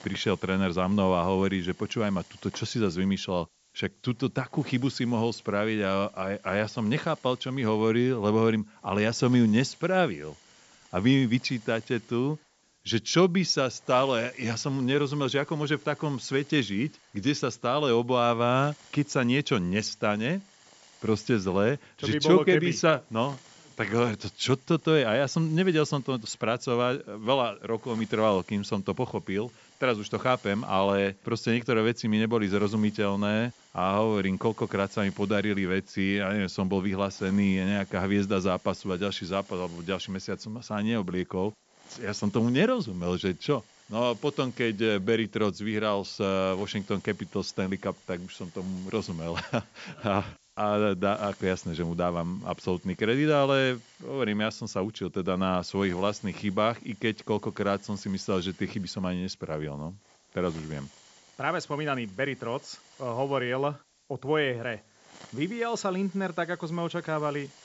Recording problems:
high frequencies cut off; noticeable; nothing above 8 kHz
hiss; faint; throughout; 25 dB below the speech

